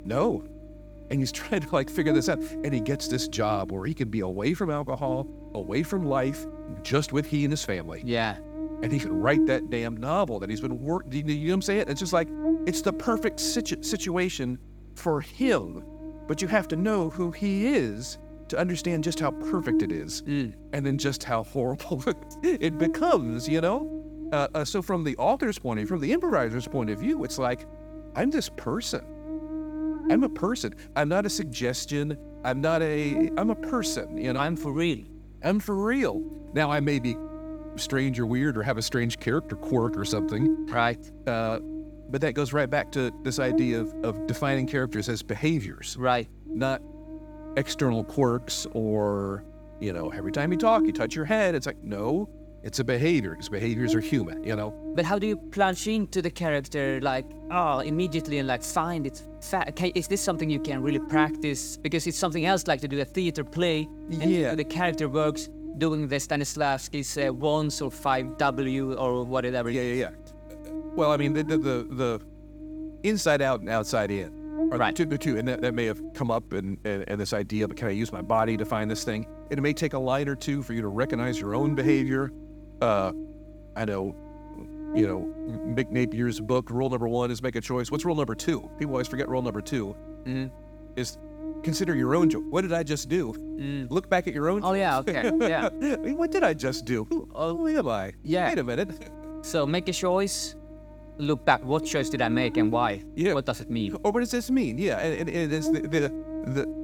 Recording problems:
electrical hum; loud; throughout; 50 Hz, 9 dB below the speech

